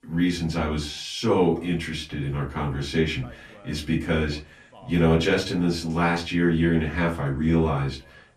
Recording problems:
off-mic speech; far
room echo; very slight; dies away in 0.3 s
voice in the background; faint; throughout; 30 dB below the speech

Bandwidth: 14 kHz